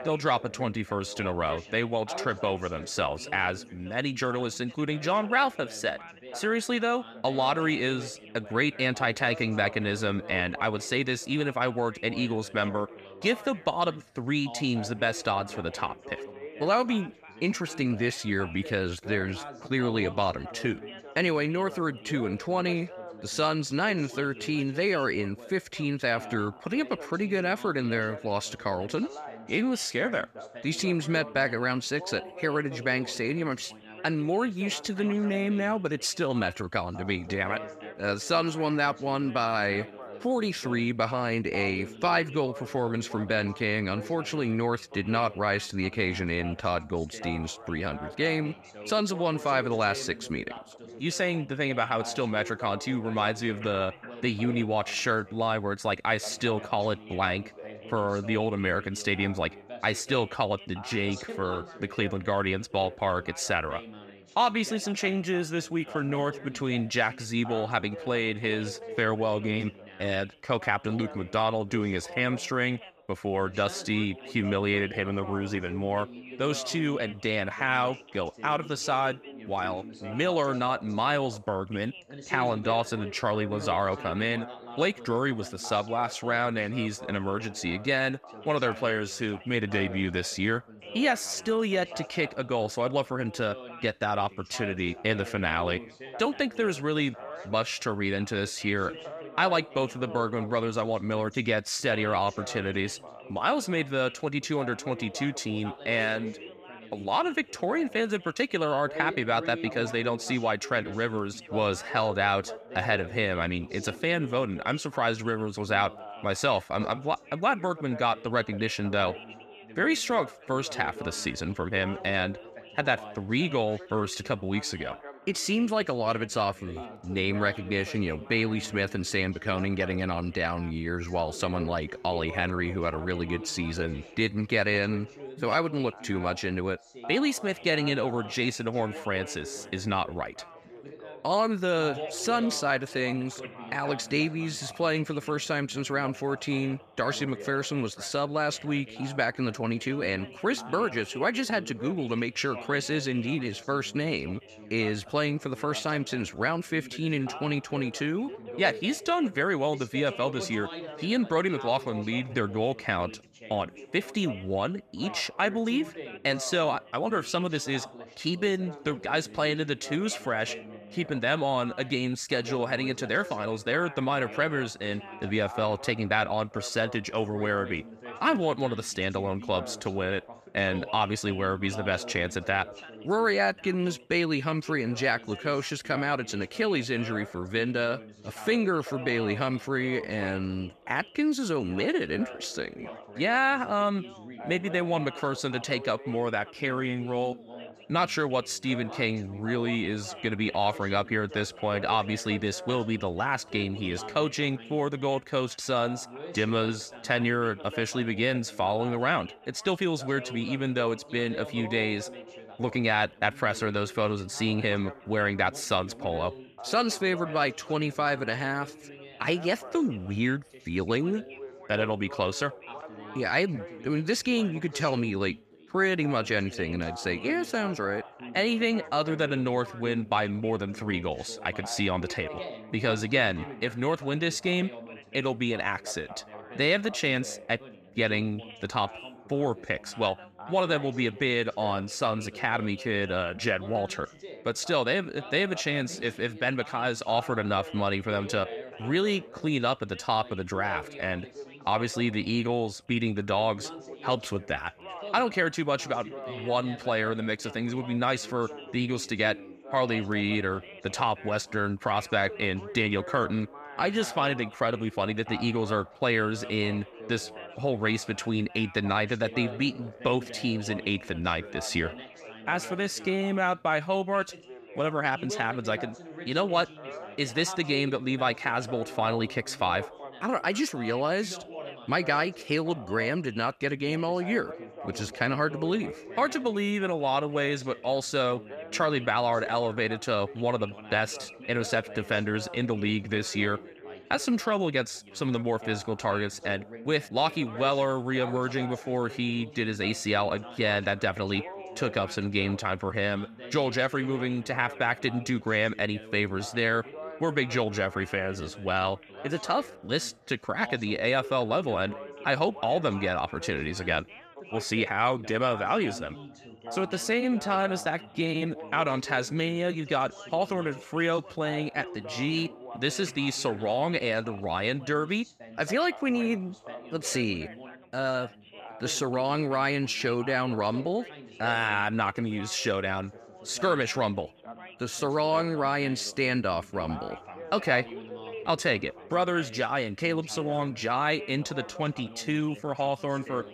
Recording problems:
background chatter; noticeable; throughout; 3 voices, 15 dB below the speech

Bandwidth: 14.5 kHz